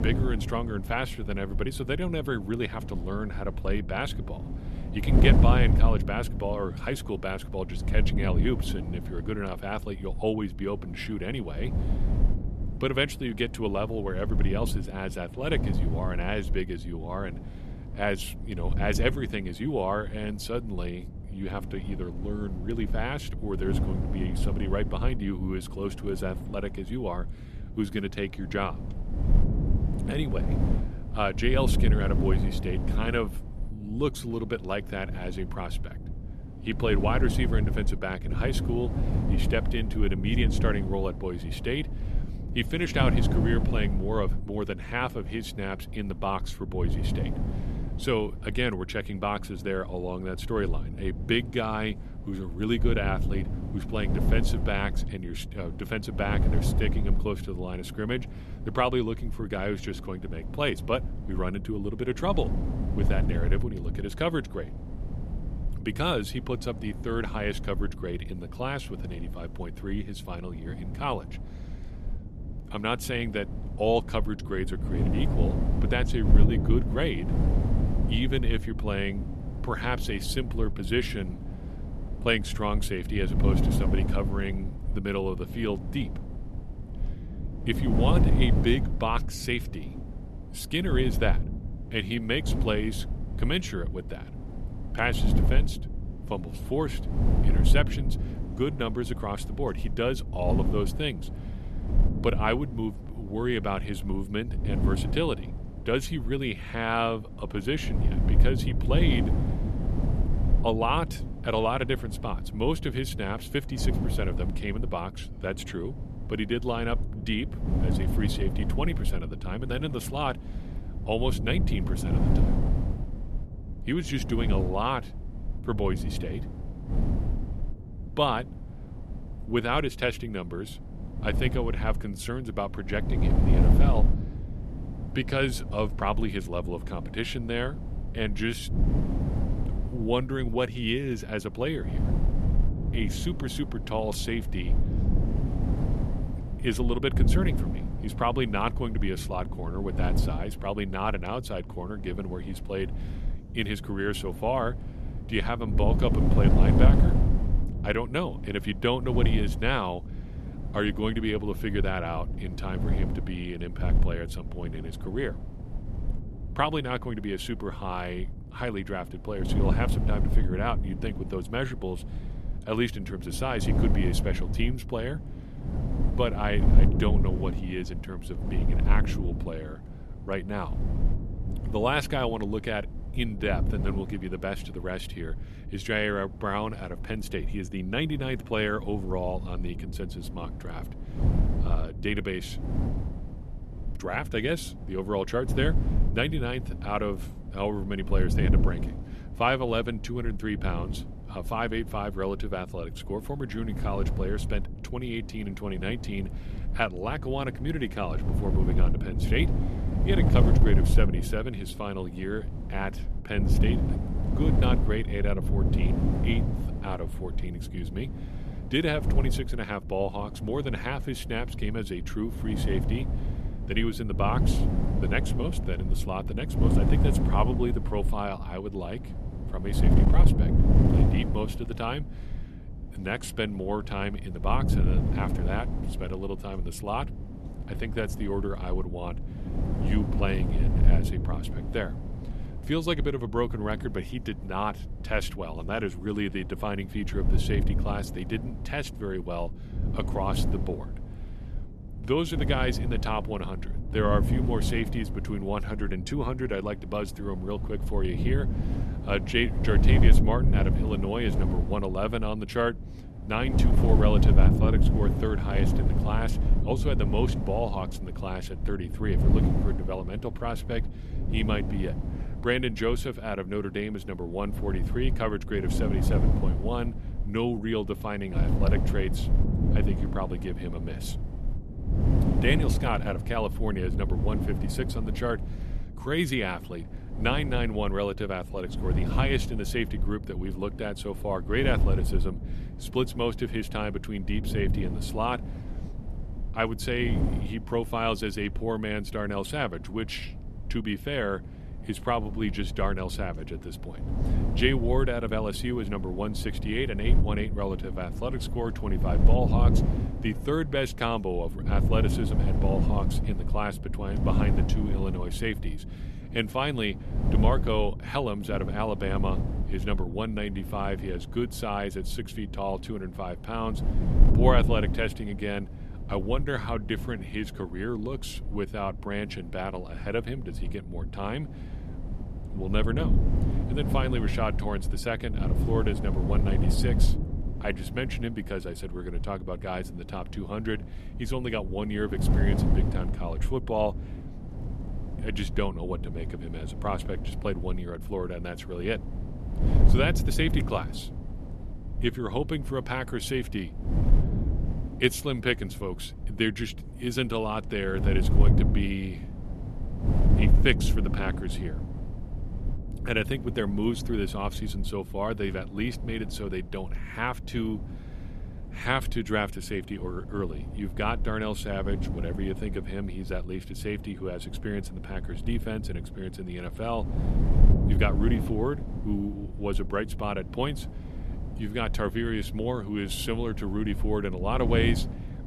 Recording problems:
wind noise on the microphone; heavy; 9 dB below the speech

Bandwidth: 13.5 kHz